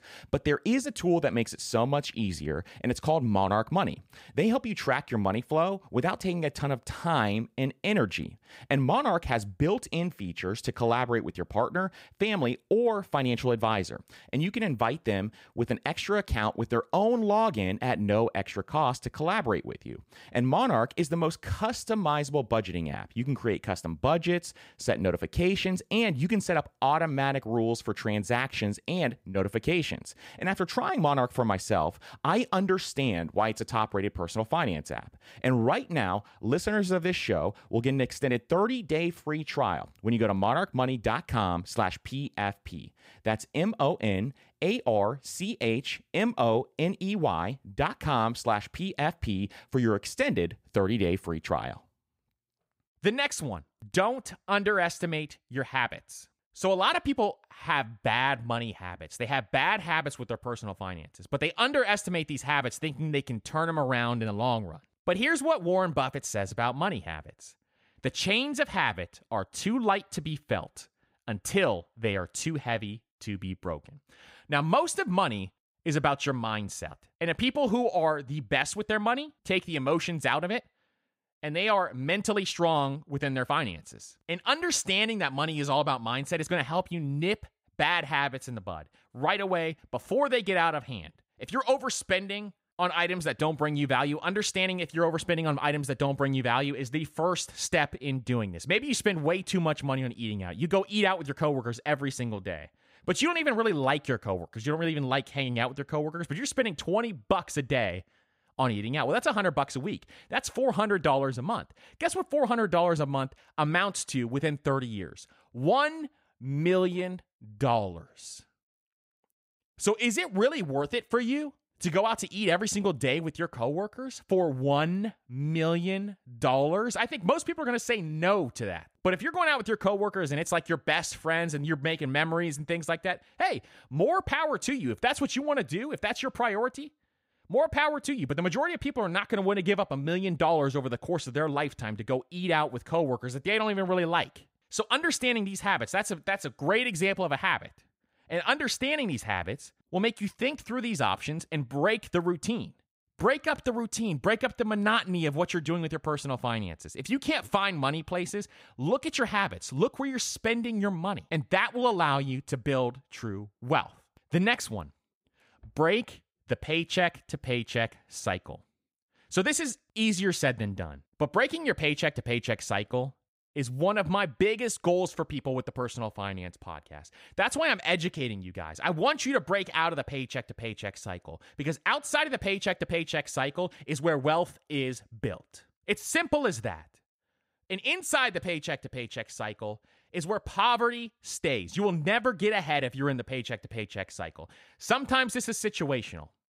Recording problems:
none

